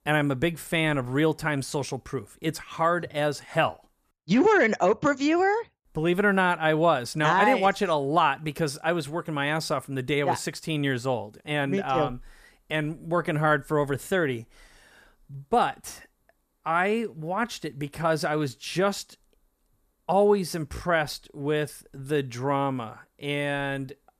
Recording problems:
none

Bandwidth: 14.5 kHz